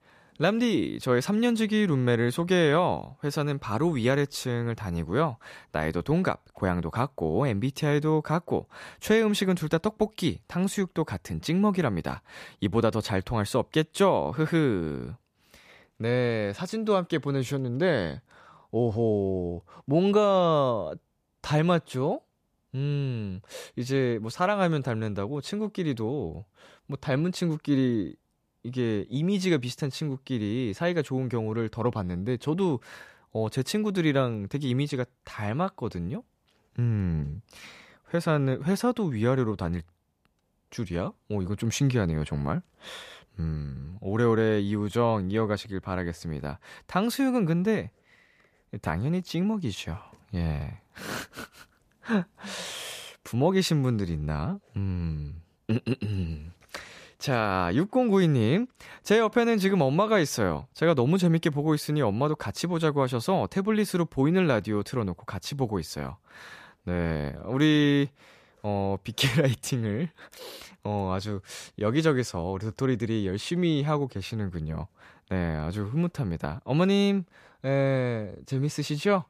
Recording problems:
none

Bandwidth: 14.5 kHz